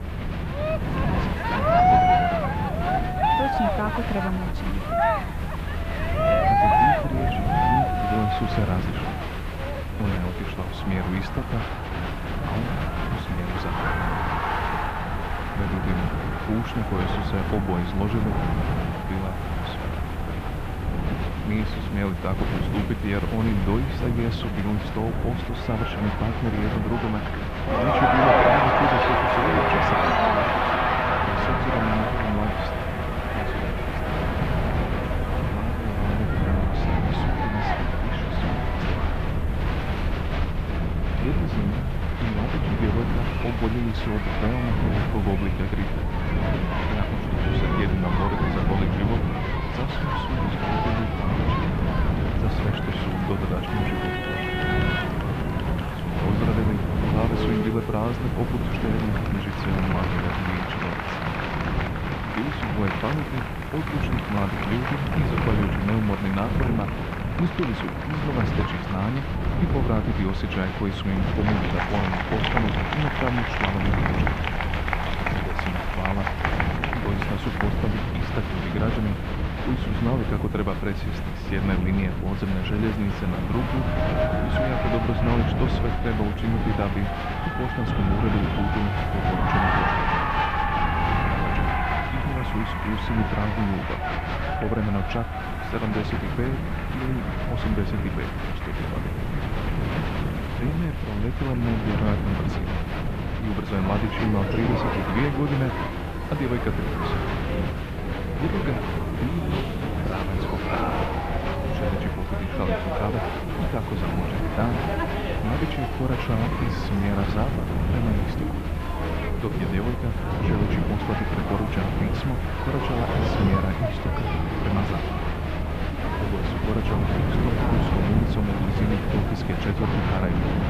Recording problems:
muffled; slightly; fading above 3 kHz
crowd noise; very loud; throughout; as loud as the speech
wind noise on the microphone; heavy; 3 dB below the speech
hiss; faint; throughout; 25 dB below the speech
low rumble; faint; until 53 s and from 1:09 on; 20 dB below the speech

